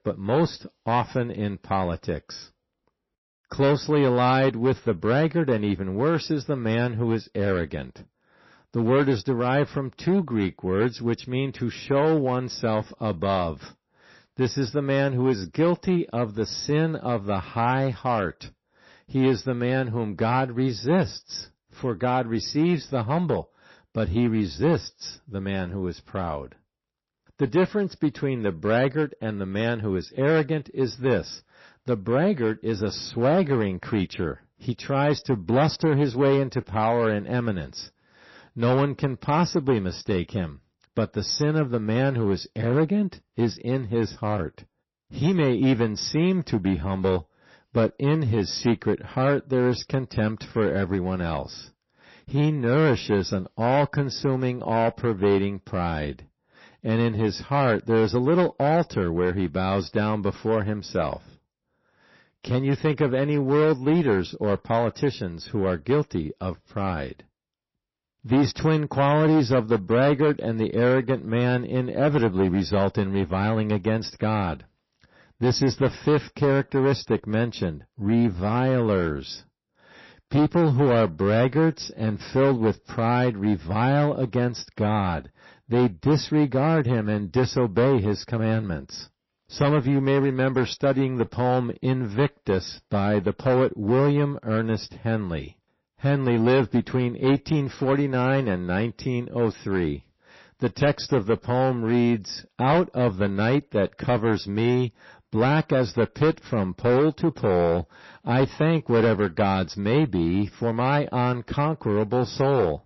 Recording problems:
distortion; slight; 6% of the sound clipped
garbled, watery; slightly; nothing above 5.5 kHz

